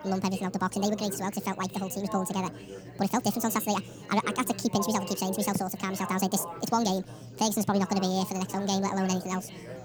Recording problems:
wrong speed and pitch; too fast and too high; 1.7 times normal speed
chatter from many people; noticeable; throughout; 15 dB below the speech

